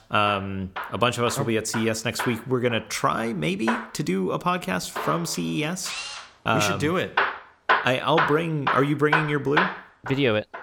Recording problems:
machinery noise; loud; throughout; 4 dB below the speech

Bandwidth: 17.5 kHz